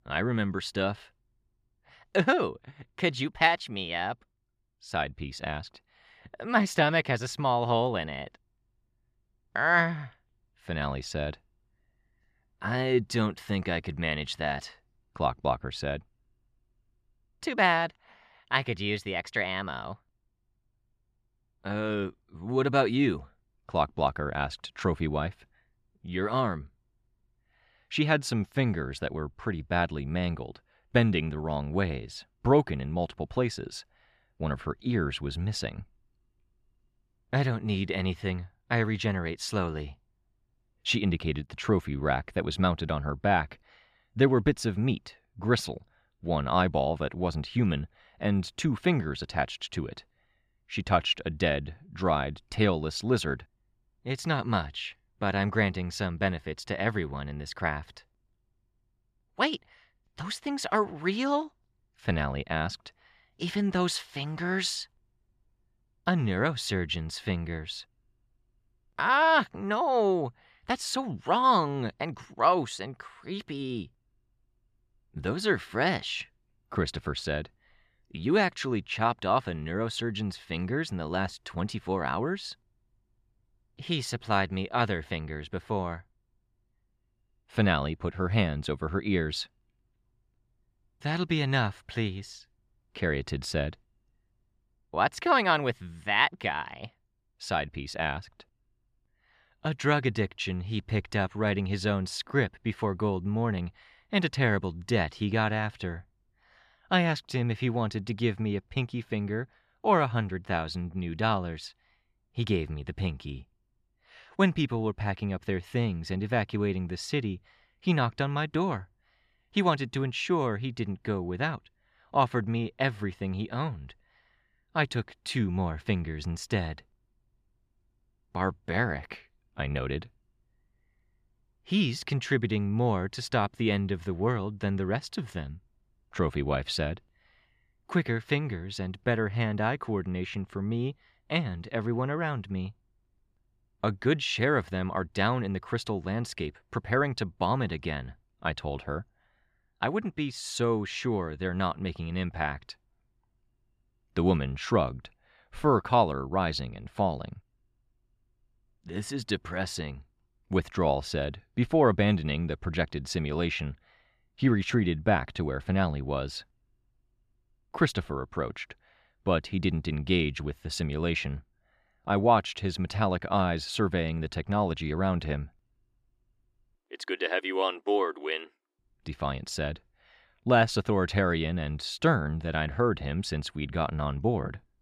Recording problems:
none

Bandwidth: 14.5 kHz